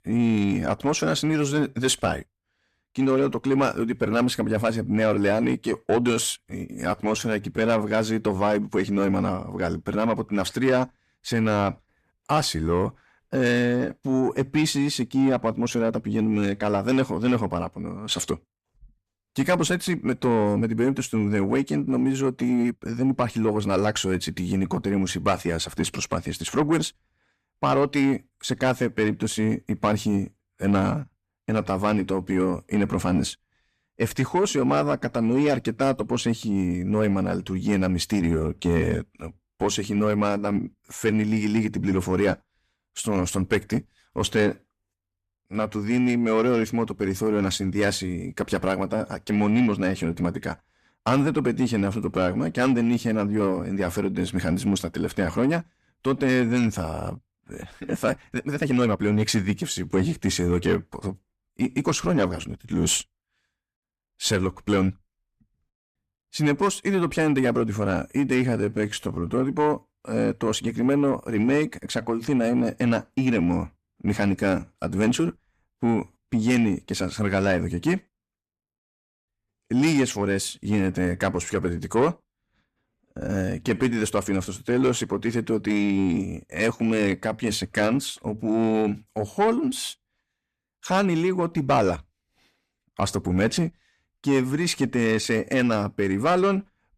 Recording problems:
distortion; slight; 10 dB below the speech
uneven, jittery; strongly; from 6 s to 1:24

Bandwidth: 14.5 kHz